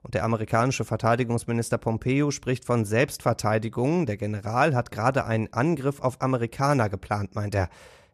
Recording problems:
none

